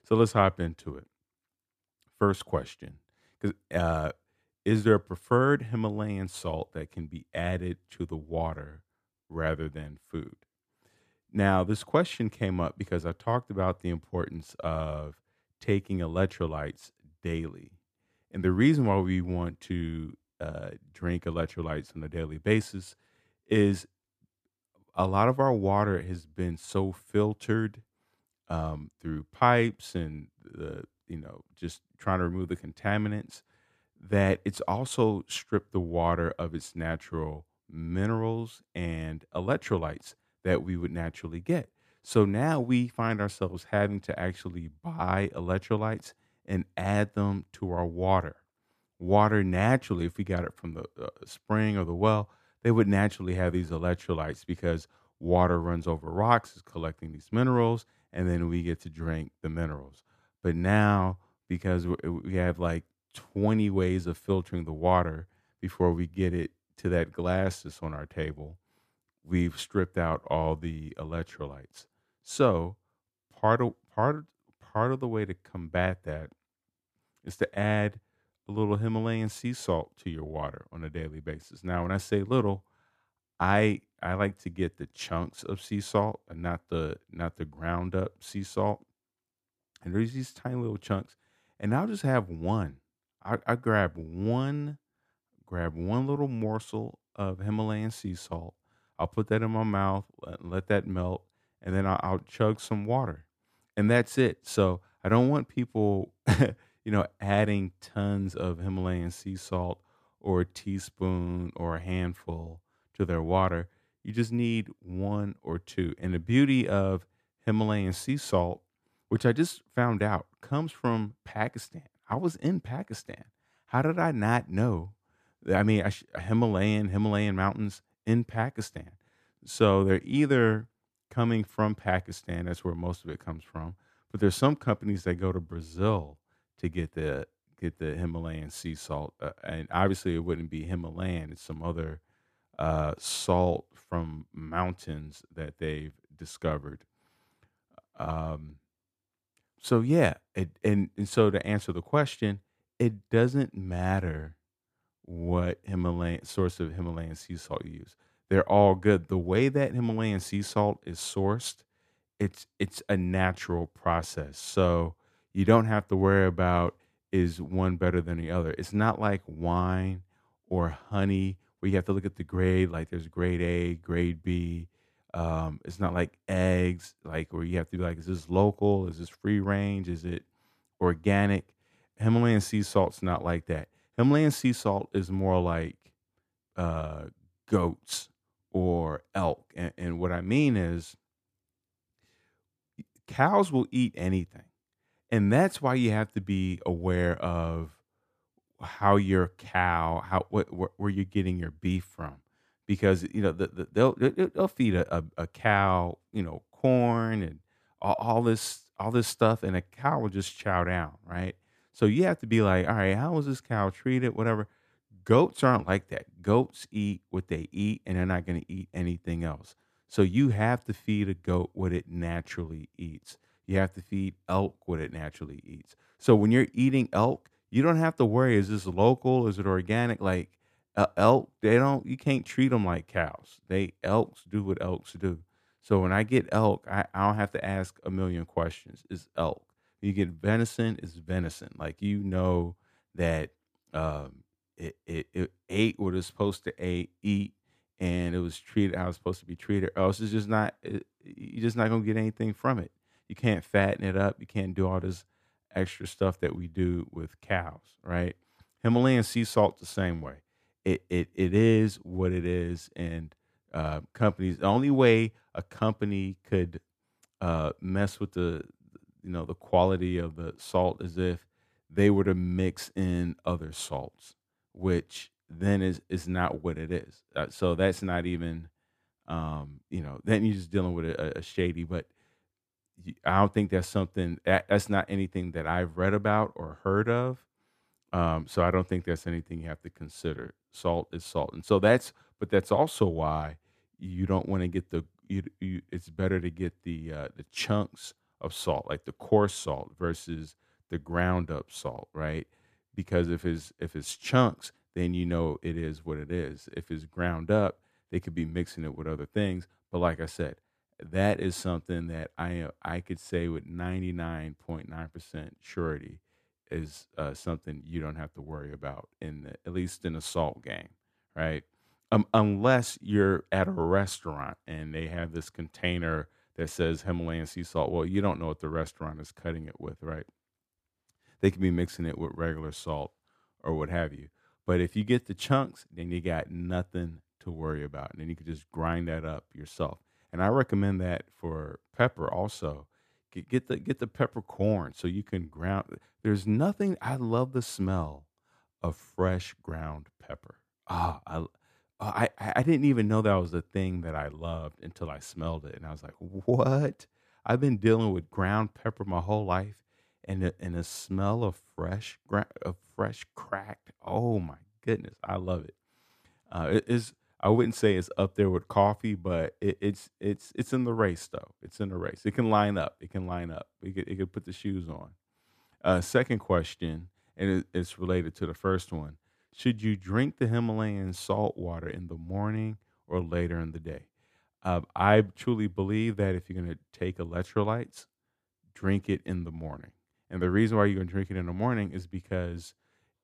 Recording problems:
none

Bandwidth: 14.5 kHz